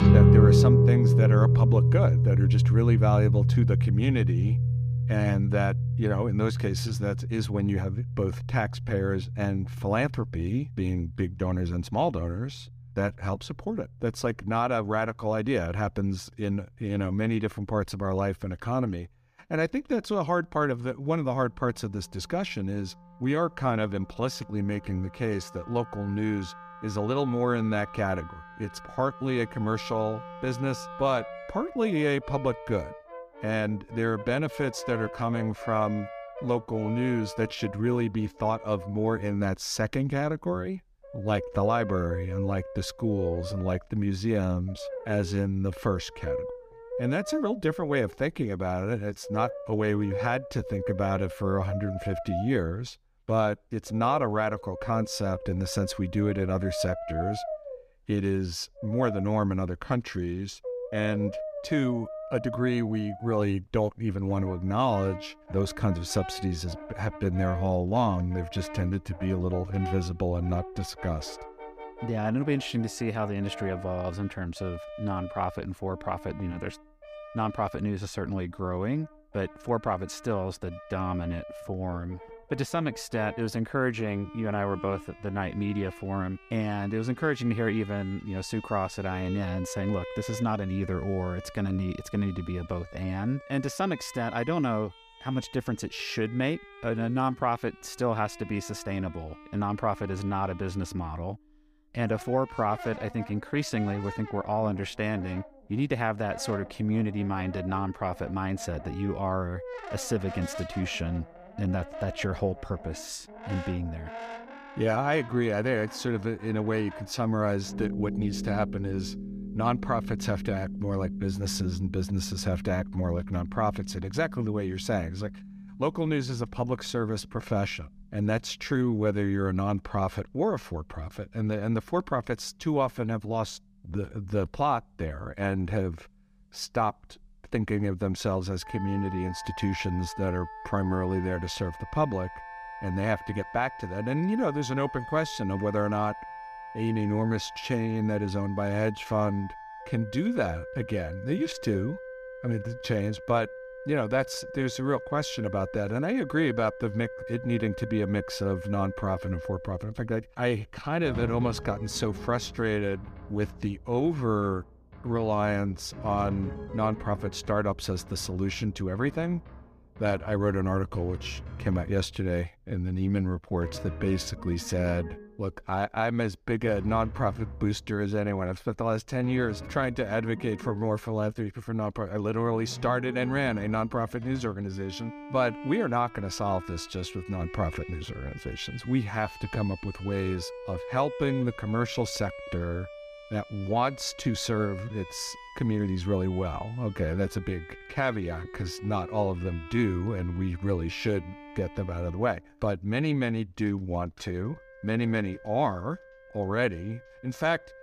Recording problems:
background music; loud; throughout; 3 dB below the speech

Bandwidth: 15 kHz